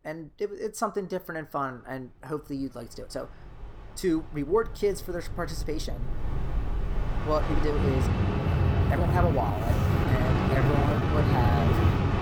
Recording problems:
train or aircraft noise; very loud; throughout; 5 dB above the speech
uneven, jittery; strongly; from 1 to 12 s

